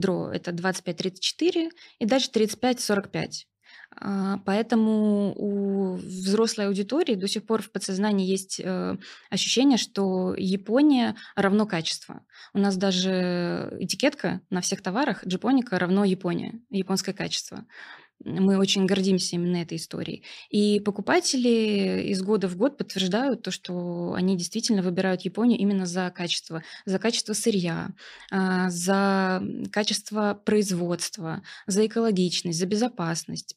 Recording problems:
abrupt cut into speech; at the start

